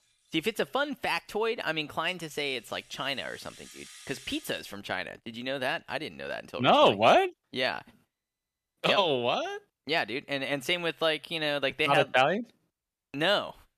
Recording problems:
background music; faint; until 5 s; 20 dB below the speech

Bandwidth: 14.5 kHz